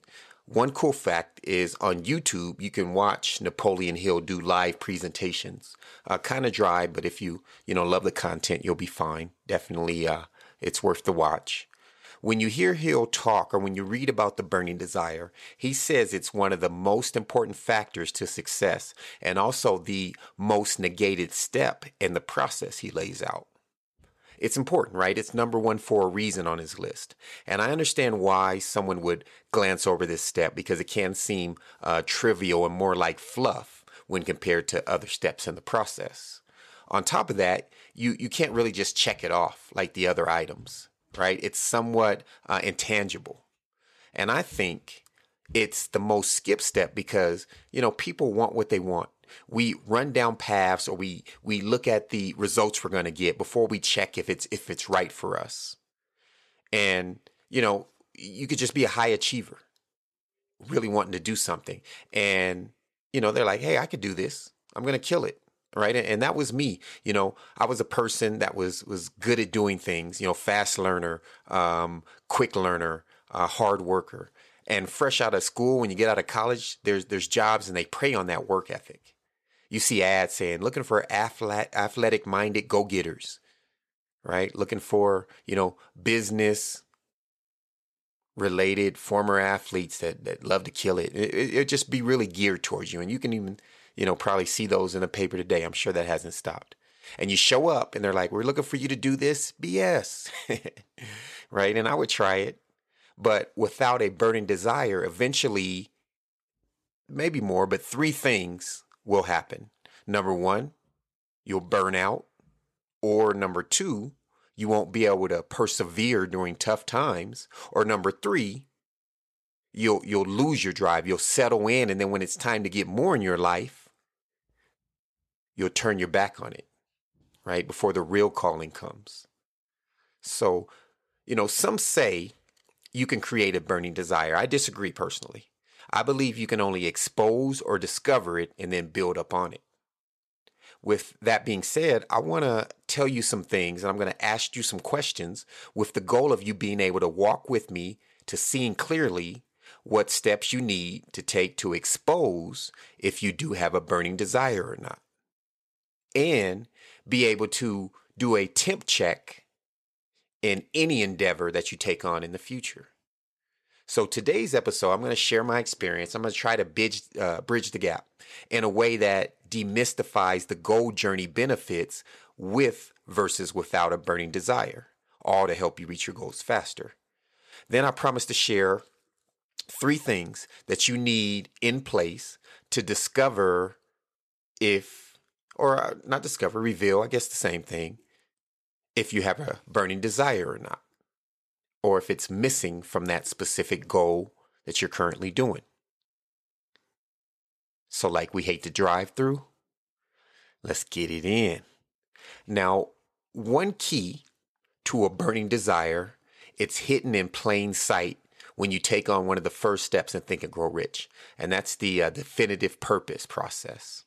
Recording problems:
none

